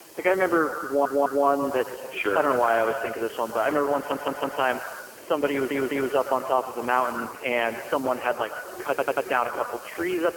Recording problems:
phone-call audio; poor line; nothing above 3 kHz
echo of what is said; strong; throughout; 110 ms later, 10 dB below the speech
murmuring crowd; noticeable; throughout; 20 dB below the speech
hiss; faint; throughout; 20 dB below the speech
audio stuttering; 4 times, first at 1 s

